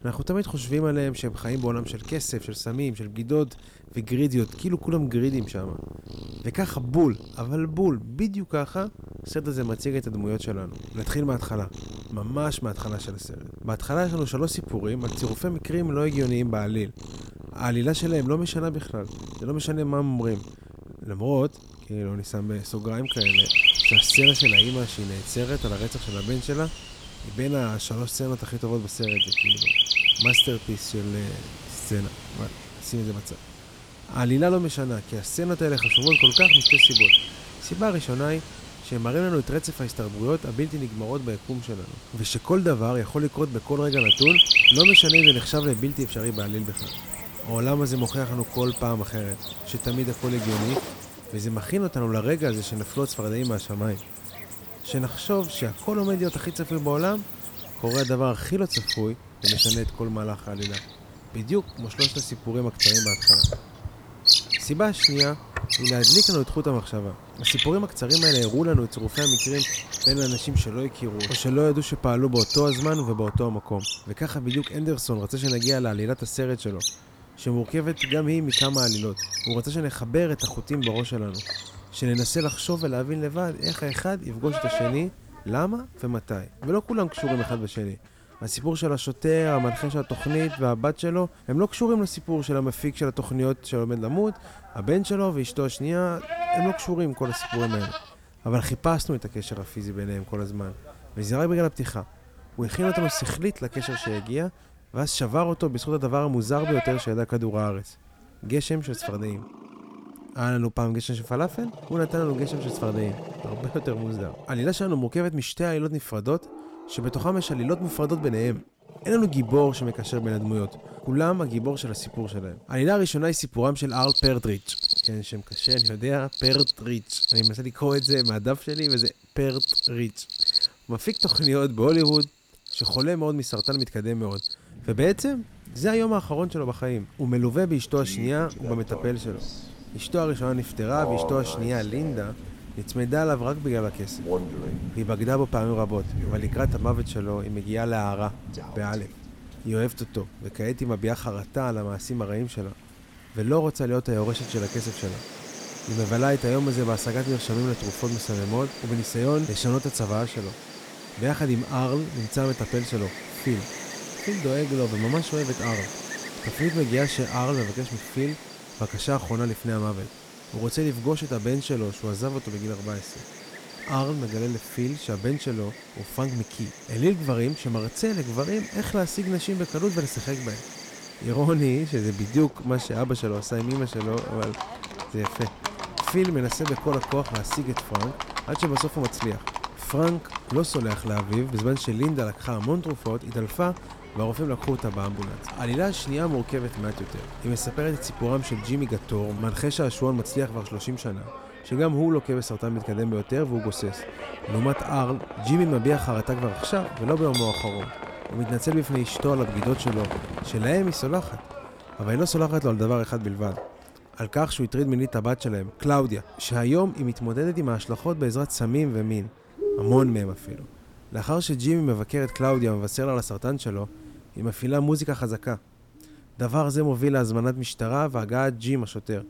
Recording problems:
animal sounds; very loud; throughout; 4 dB above the speech

